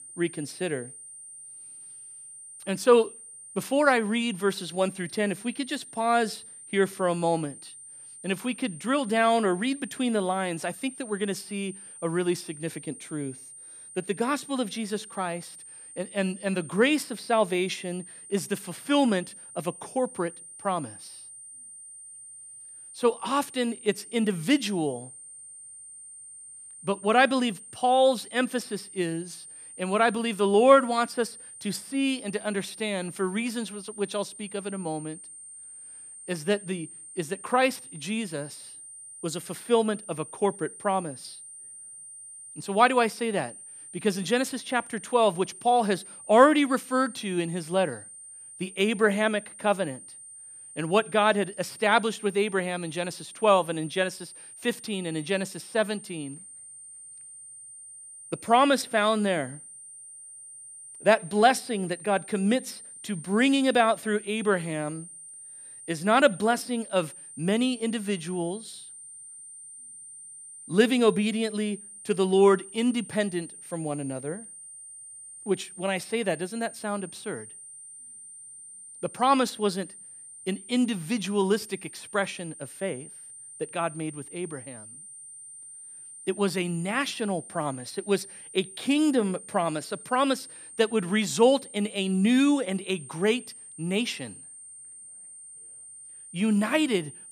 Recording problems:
high-pitched whine; noticeable; throughout; 9 kHz, 15 dB below the speech

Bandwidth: 14.5 kHz